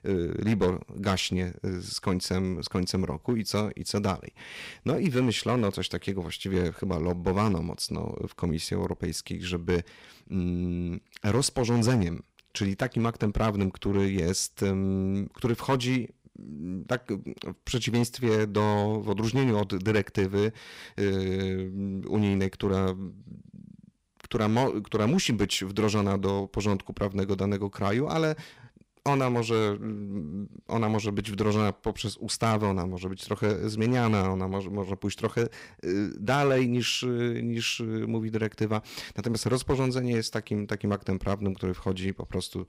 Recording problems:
distortion; slight; 3% of the sound clipped

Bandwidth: 15.5 kHz